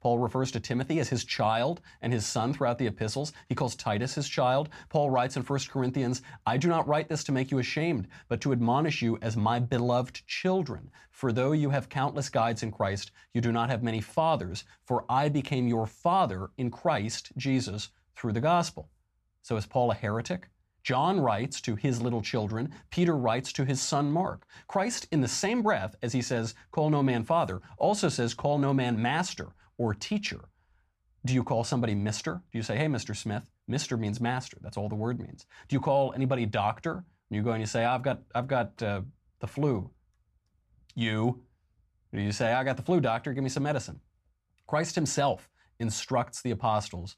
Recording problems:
none

